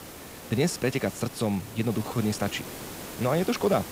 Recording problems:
hiss; noticeable; throughout; 10 dB below the speech
uneven, jittery; strongly

